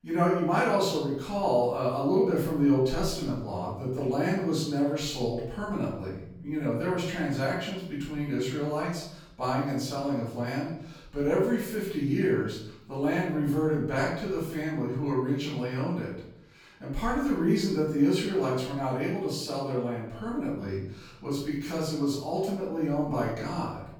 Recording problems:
off-mic speech; far
room echo; noticeable; dies away in 0.7 s

